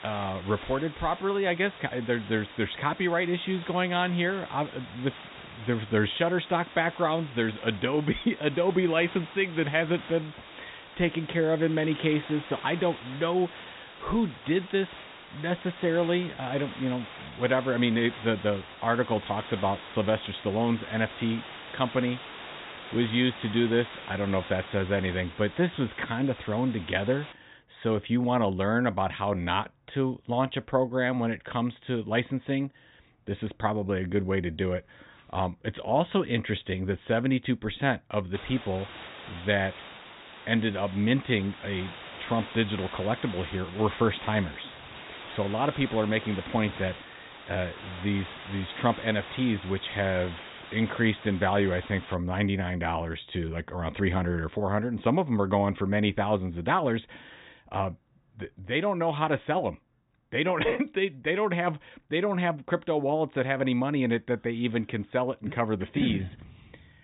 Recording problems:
high frequencies cut off; severe; nothing above 4 kHz
hiss; noticeable; until 27 s and from 38 to 52 s; 15 dB below the speech

